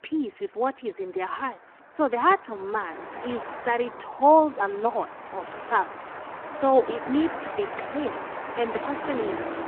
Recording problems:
phone-call audio; poor line
traffic noise; loud; throughout; 9 dB below the speech

